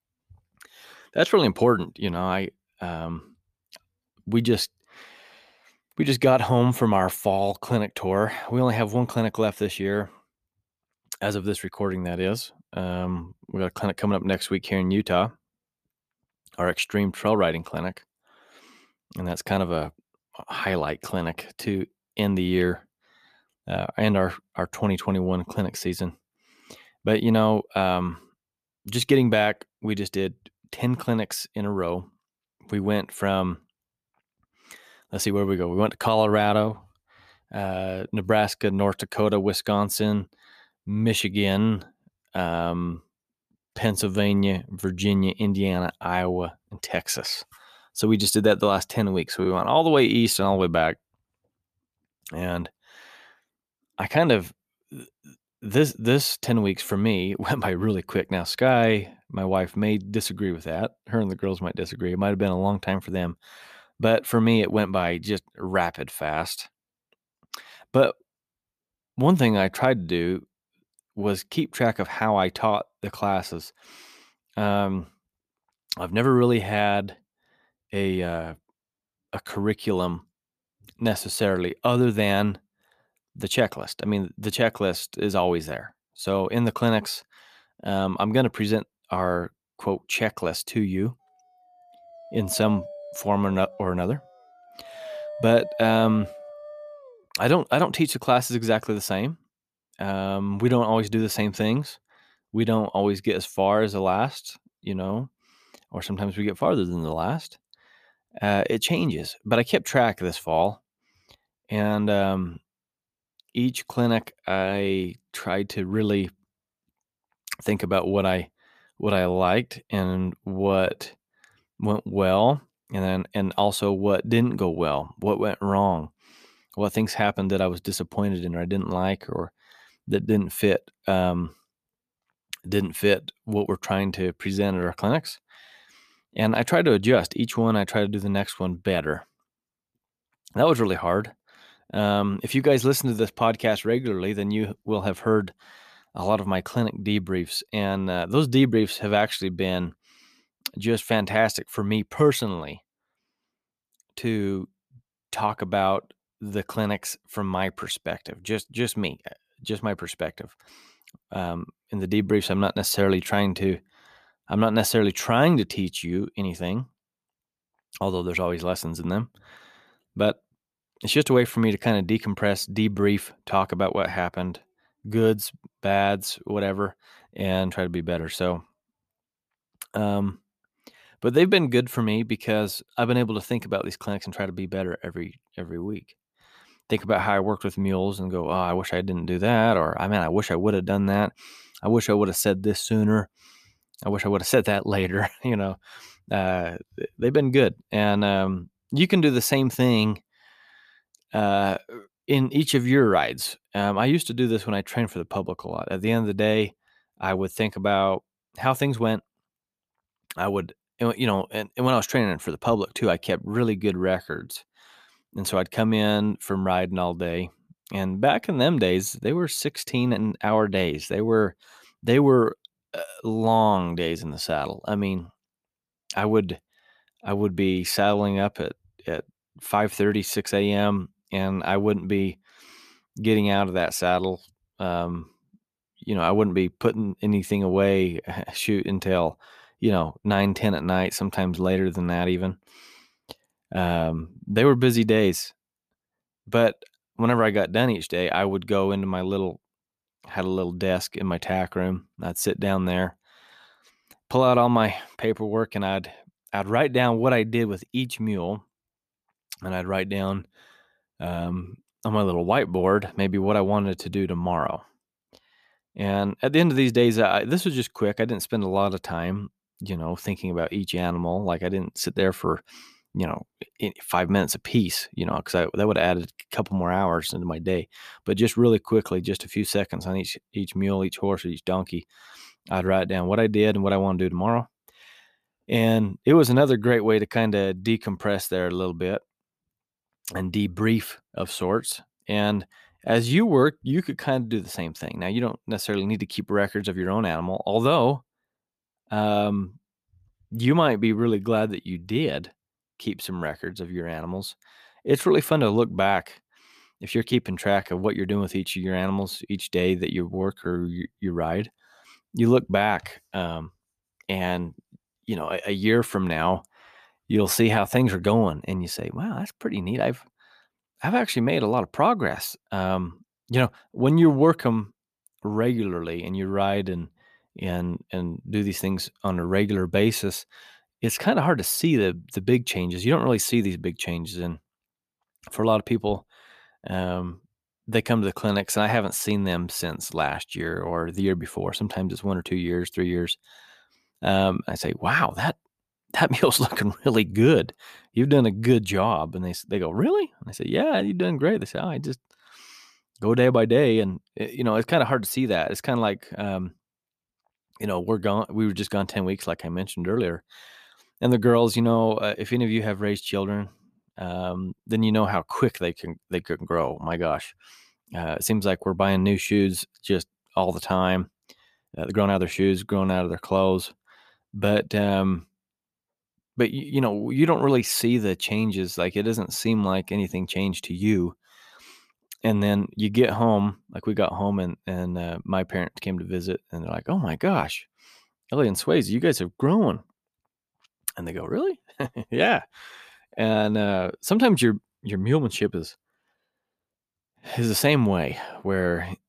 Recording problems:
uneven, jittery; strongly; from 43 s to 6:12
dog barking; faint; from 1:32 to 1:37; peak 10 dB below the speech

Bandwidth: 14.5 kHz